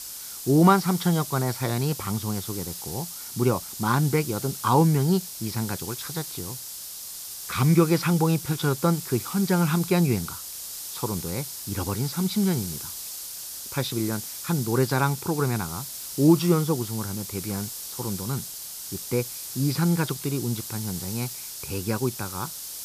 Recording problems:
high frequencies cut off; noticeable; nothing above 5.5 kHz
hiss; loud; throughout; 8 dB below the speech

